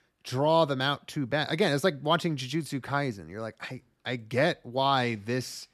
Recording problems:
none

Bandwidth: 13.5 kHz